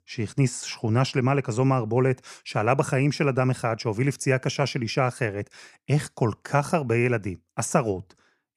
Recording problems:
none

